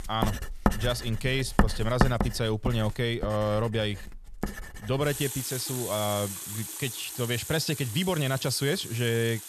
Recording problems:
household noises; loud; throughout; 4 dB below the speech

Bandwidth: 13.5 kHz